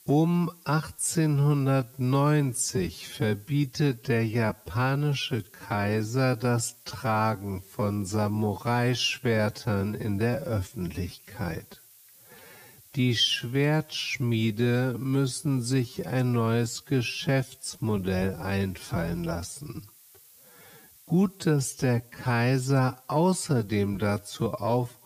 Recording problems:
wrong speed, natural pitch; too slow; 0.5 times normal speed
hiss; faint; throughout; 25 dB below the speech

